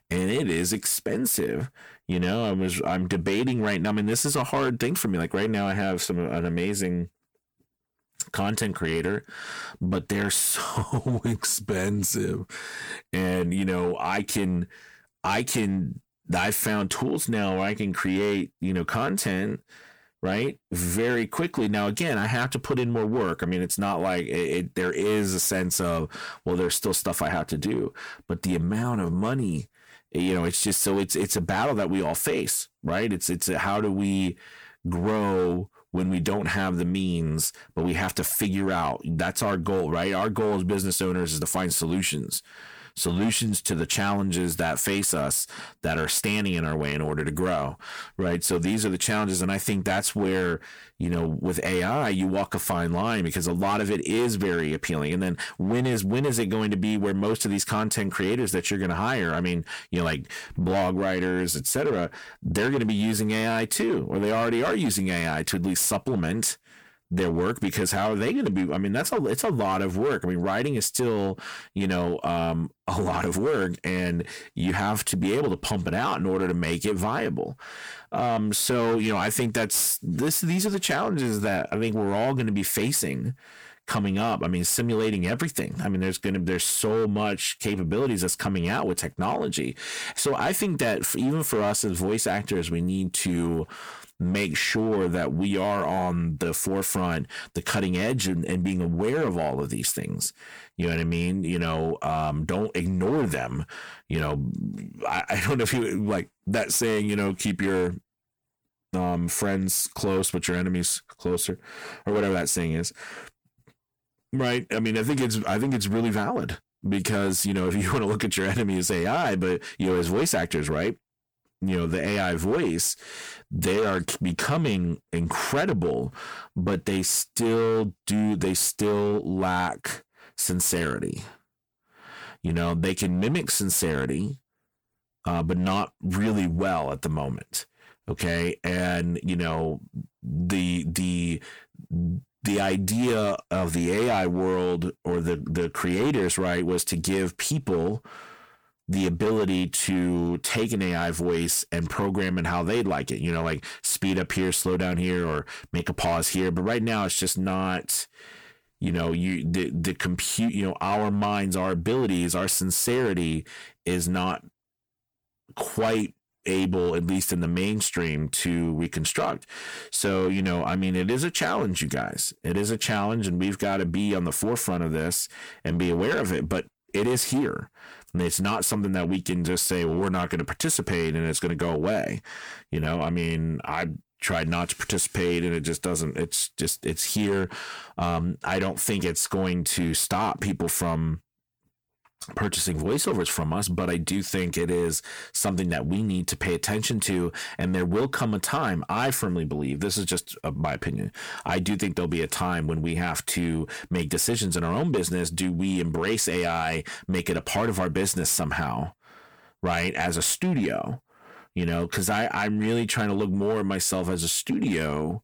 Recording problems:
distortion; slight; 7% of the sound clipped
squashed, flat; somewhat

